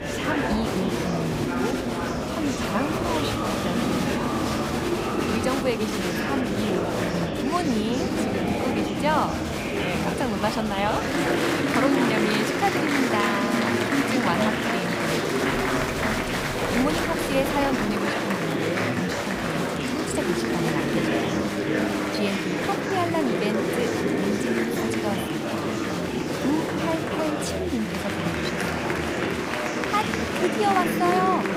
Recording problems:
murmuring crowd; very loud; throughout; 4 dB above the speech
doorbell; noticeable; from 16 to 18 s; peak 7 dB below the speech

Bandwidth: 15.5 kHz